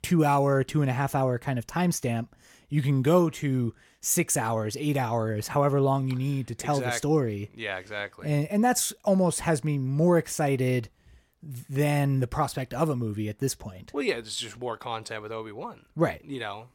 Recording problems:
none

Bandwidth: 17 kHz